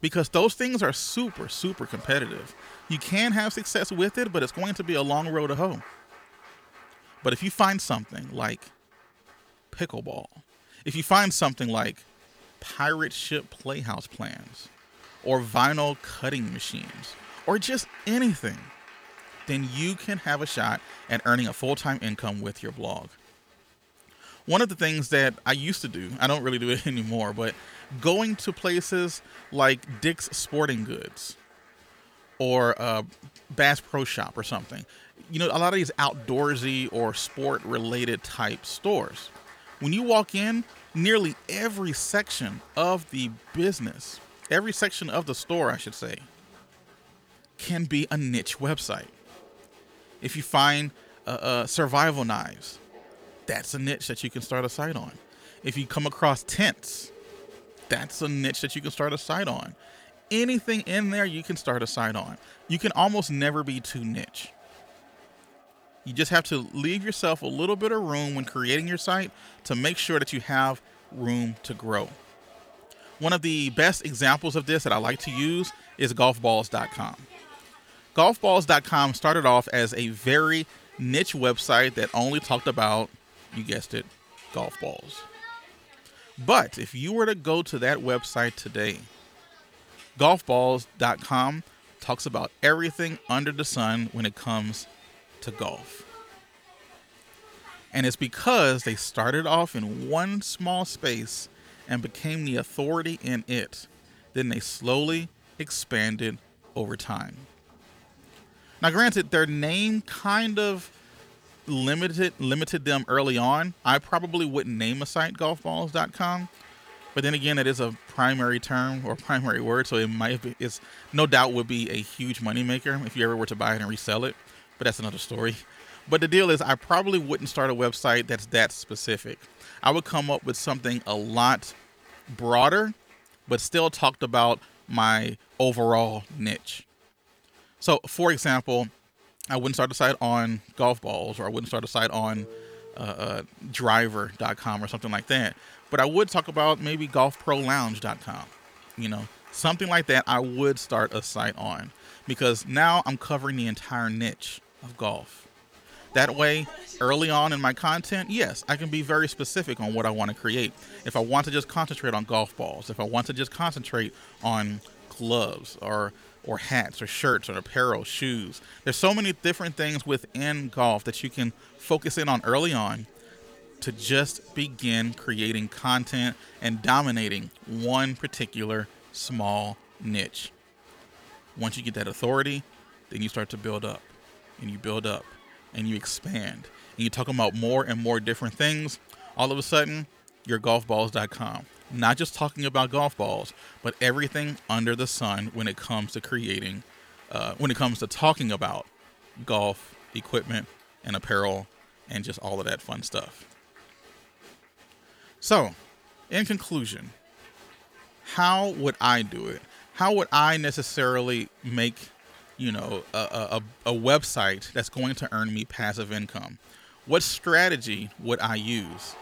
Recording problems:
crowd noise; faint; throughout; 25 dB below the speech

